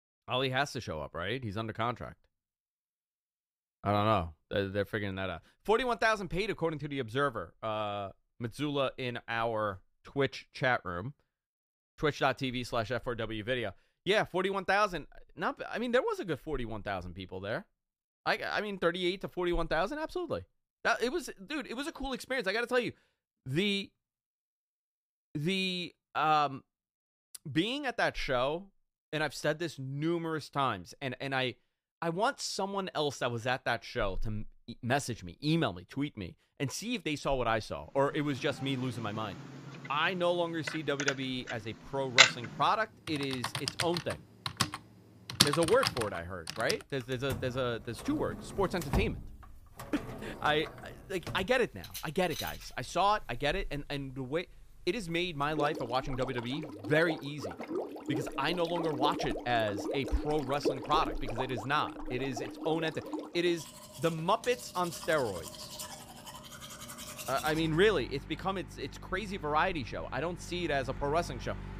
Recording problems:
household noises; loud; from 38 s on; 3 dB below the speech

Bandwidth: 15 kHz